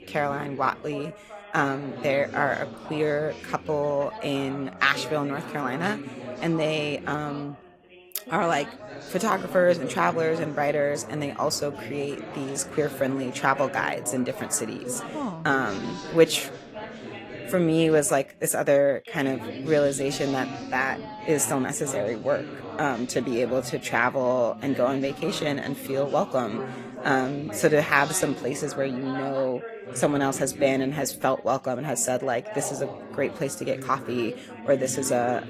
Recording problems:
garbled, watery; slightly
background chatter; noticeable; throughout; 3 voices, 10 dB below the speech

